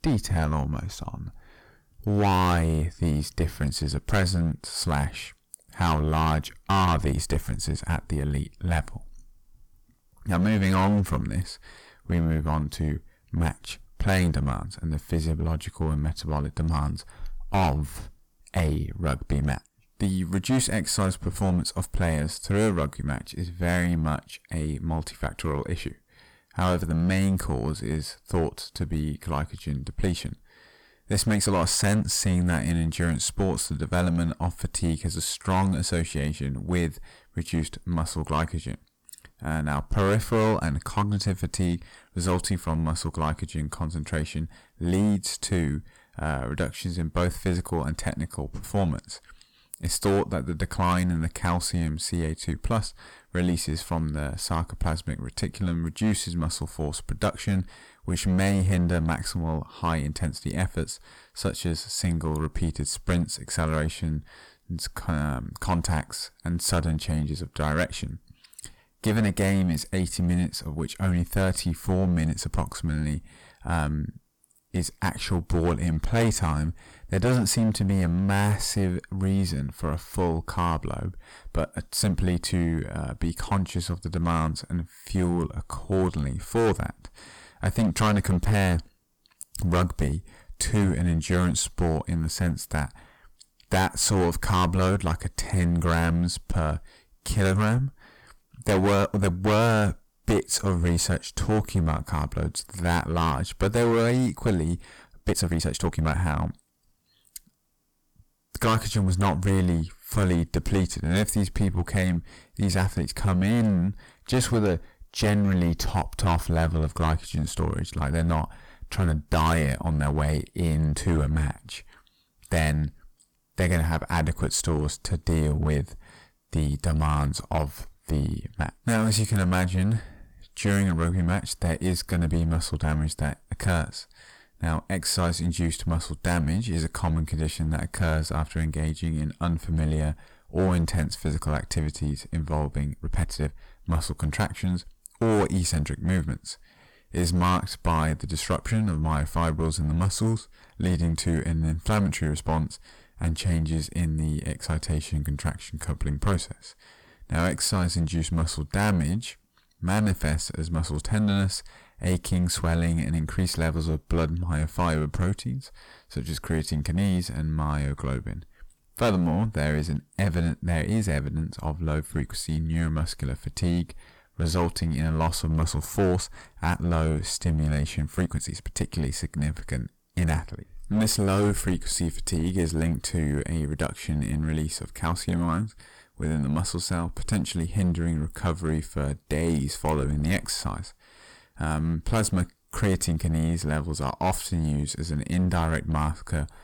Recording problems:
distortion; heavy; 9% of the sound clipped
uneven, jittery; strongly; from 1:25 to 2:59

